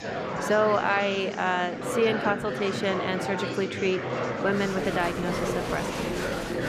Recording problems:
murmuring crowd; loud; throughout; 3 dB below the speech

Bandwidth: 14.5 kHz